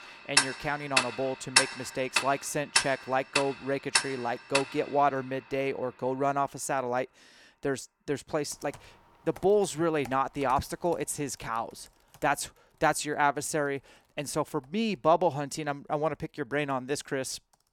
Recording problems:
household noises; very loud; throughout; 2 dB above the speech

